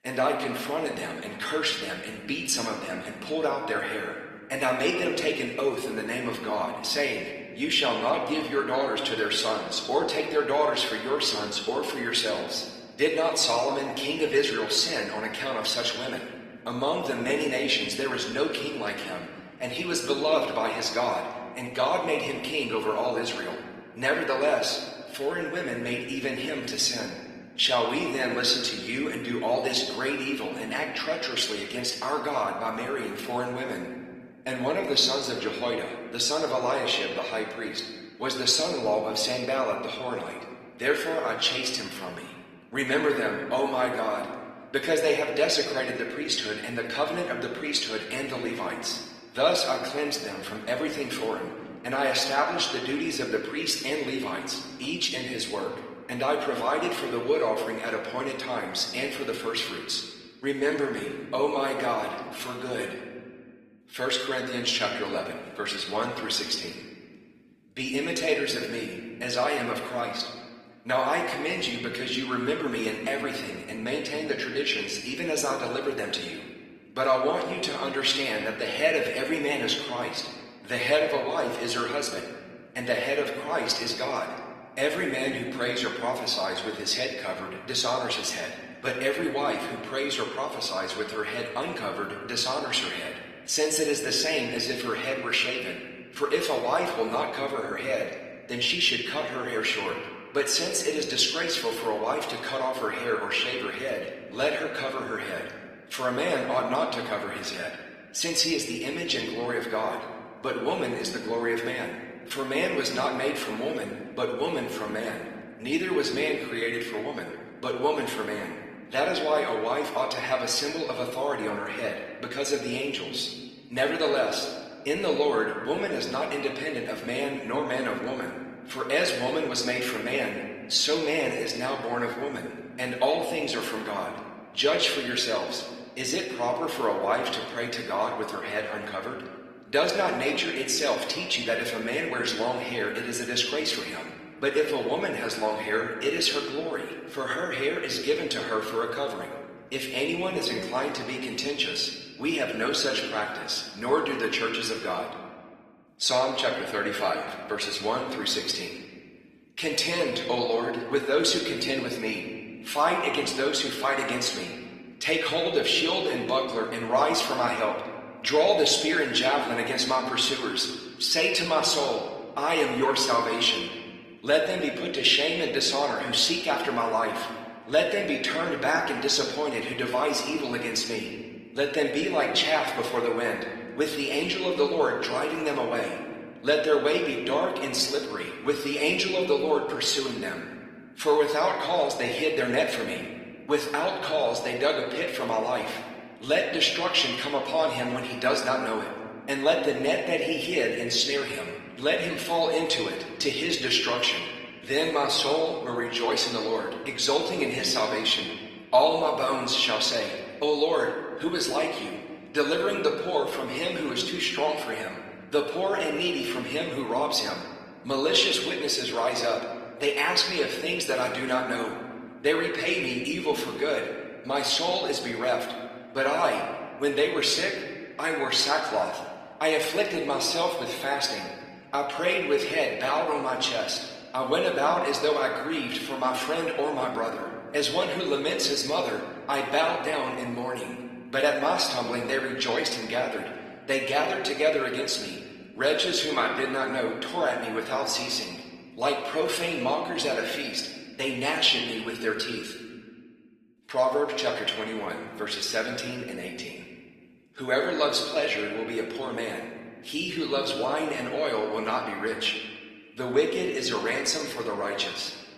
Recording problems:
room echo; slight; dies away in 1.6 s
off-mic speech; somewhat distant
garbled, watery; slightly; nothing above 14 kHz
thin; very slightly; fading below 800 Hz

